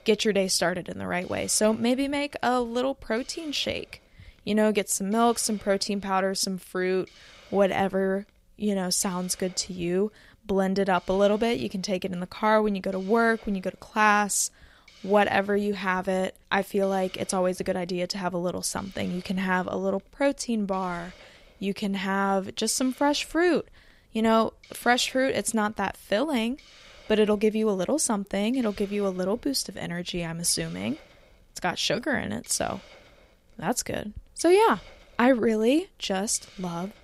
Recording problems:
hiss; faint; throughout; 25 dB below the speech

